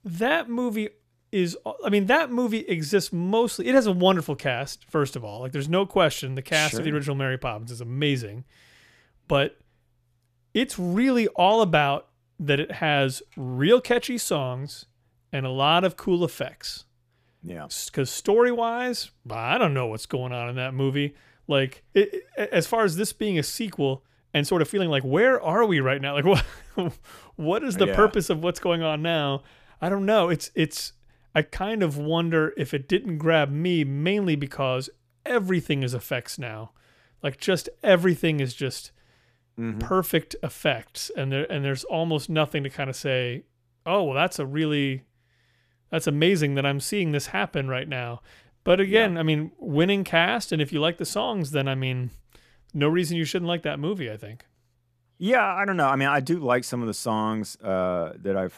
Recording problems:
uneven, jittery; strongly; from 24 to 49 s

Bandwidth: 14.5 kHz